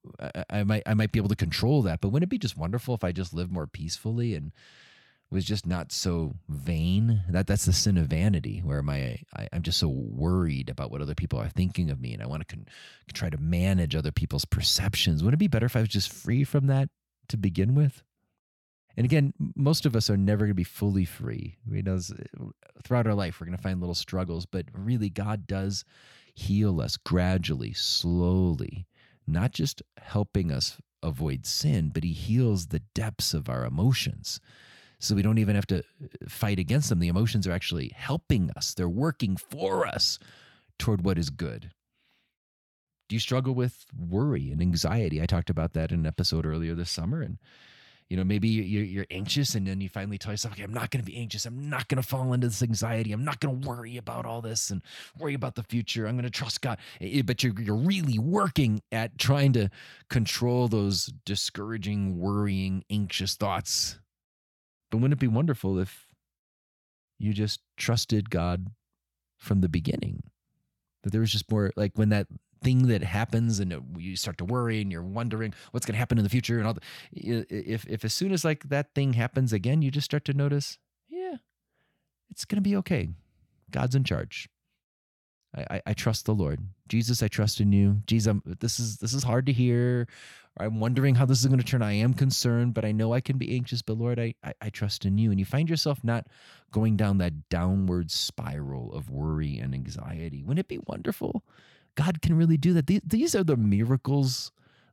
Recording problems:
none

